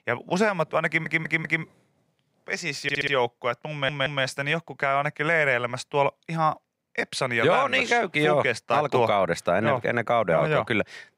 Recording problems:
audio stuttering; at 1 s, at 3 s and at 3.5 s

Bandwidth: 15.5 kHz